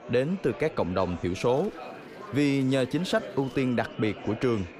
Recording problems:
murmuring crowd; noticeable; throughout; 15 dB below the speech
electrical hum; faint; from 1.5 to 3.5 s; 50 Hz, 25 dB below the speech

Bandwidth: 15.5 kHz